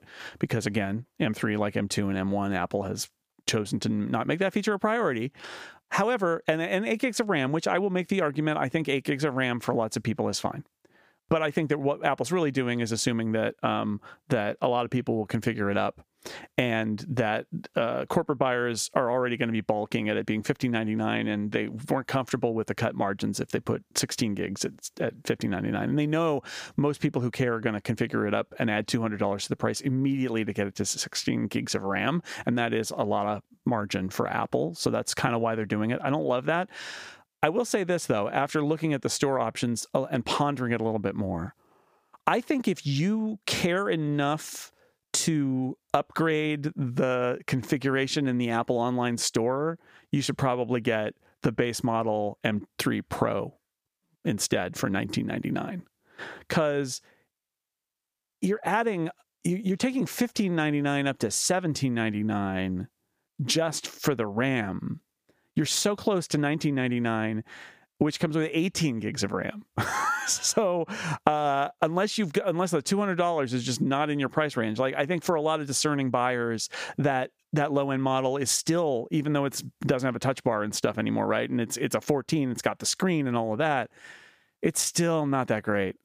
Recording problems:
squashed, flat; somewhat

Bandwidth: 15 kHz